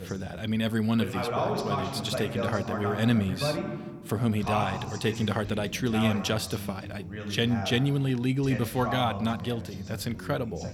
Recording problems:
voice in the background; loud; throughout; 5 dB below the speech

